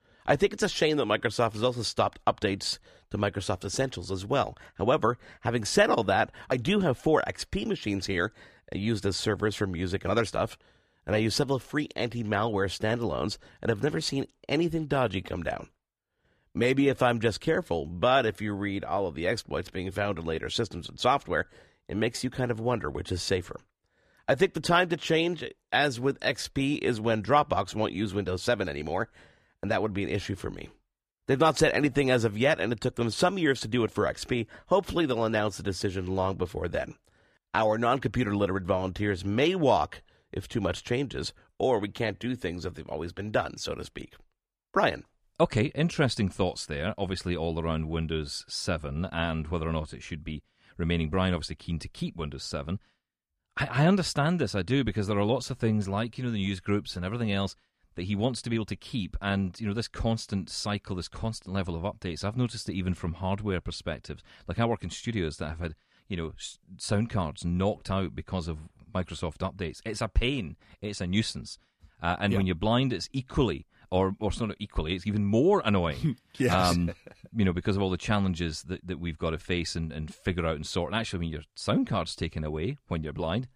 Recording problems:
none

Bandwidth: 14.5 kHz